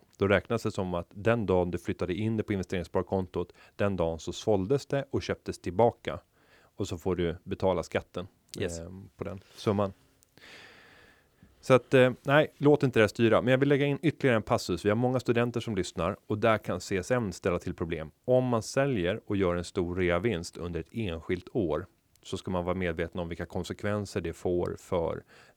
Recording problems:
none

